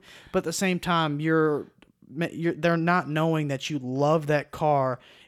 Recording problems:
none

